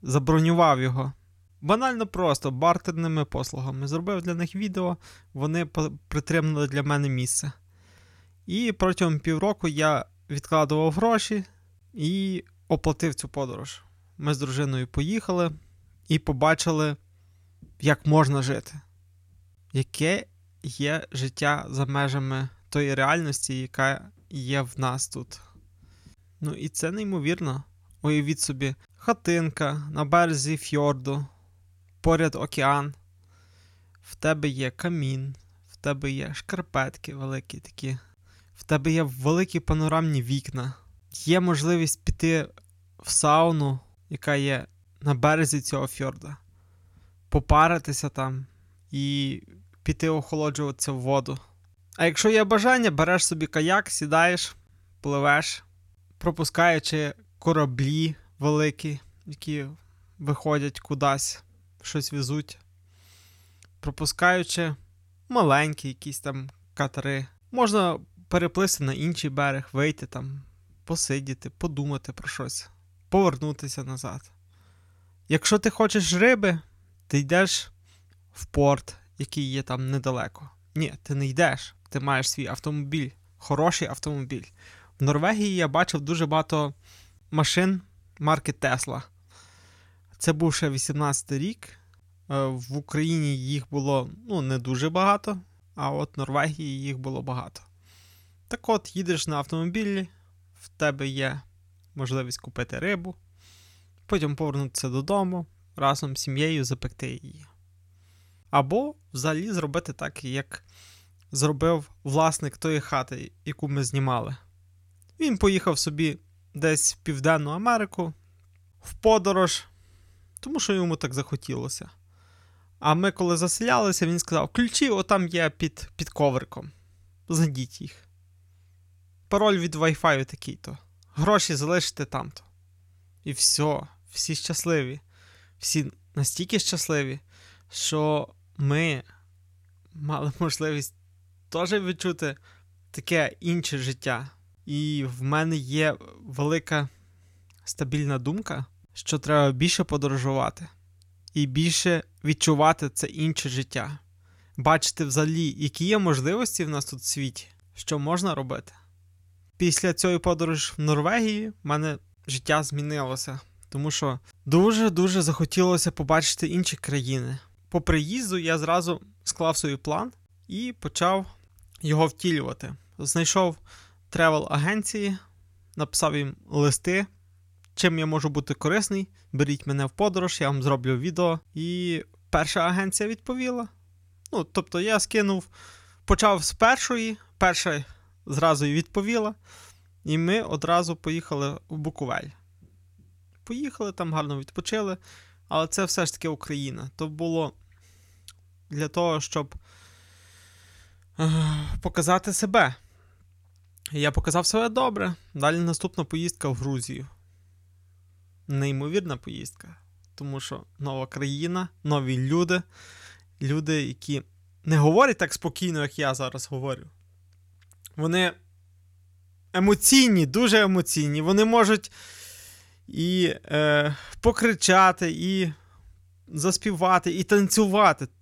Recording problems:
none

